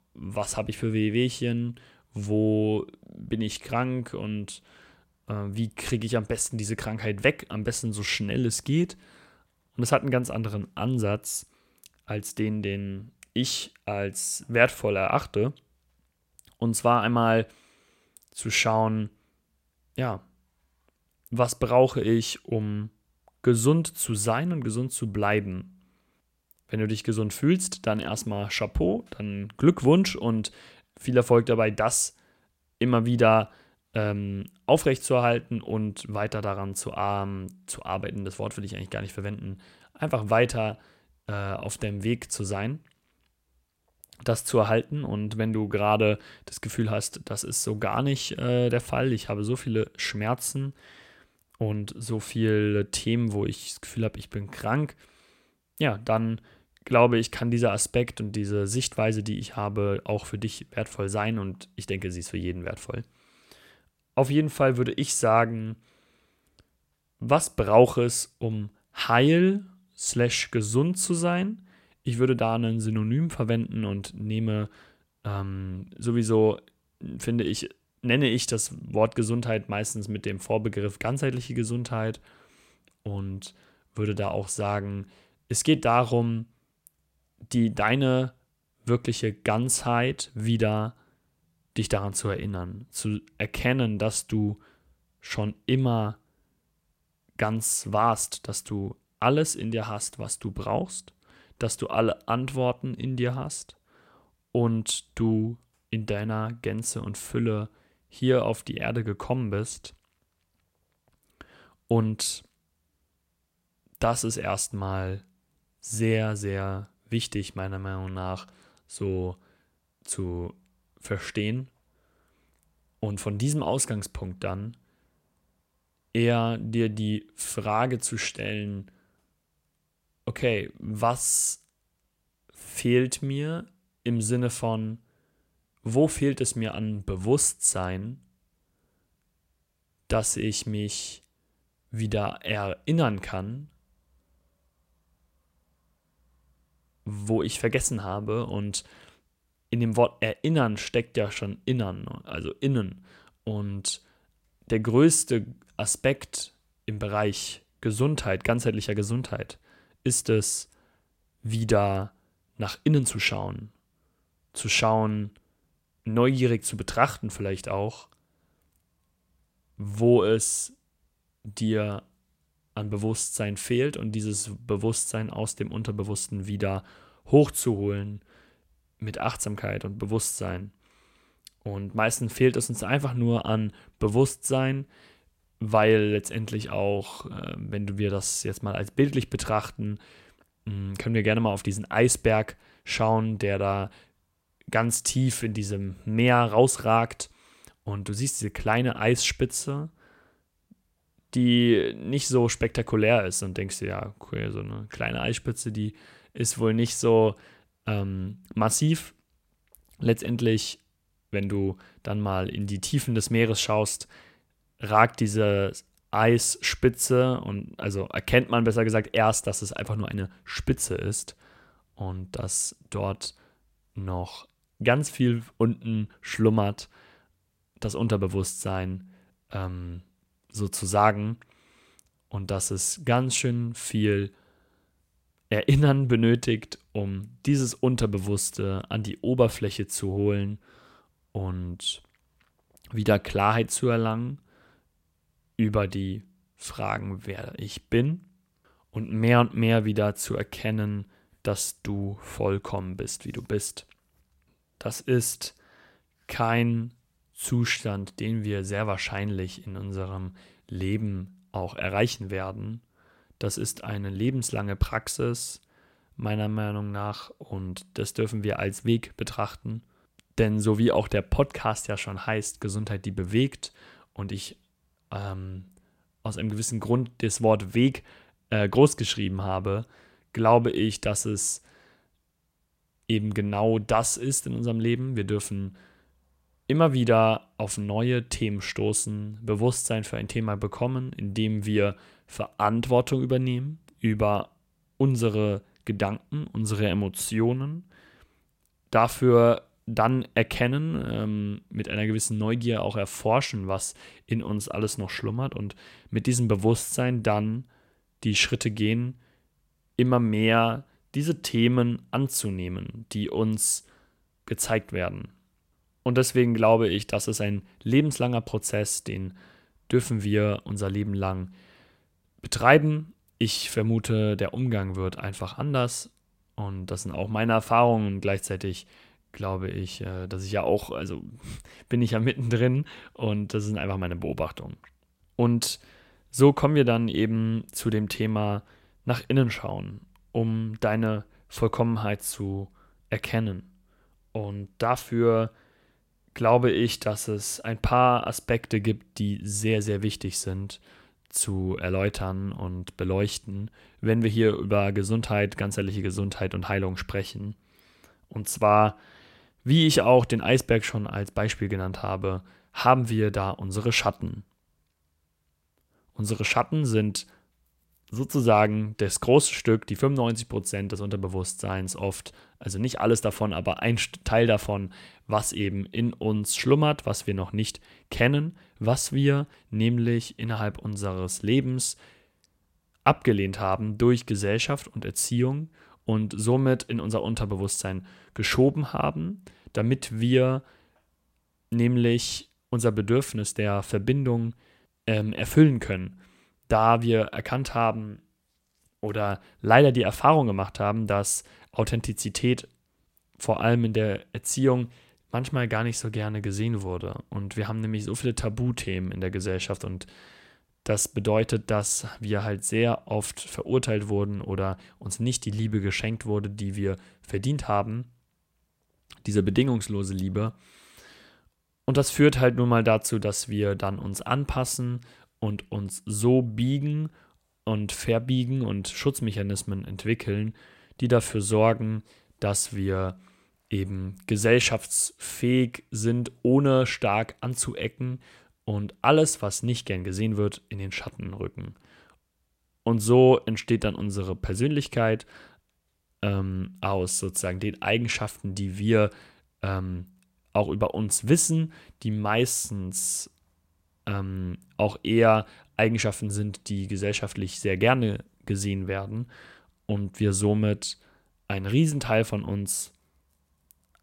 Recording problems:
none

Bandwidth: 16 kHz